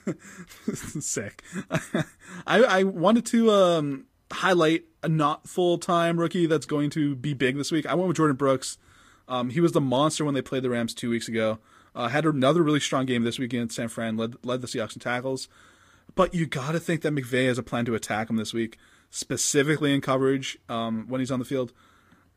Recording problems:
garbled, watery; slightly; nothing above 15 kHz

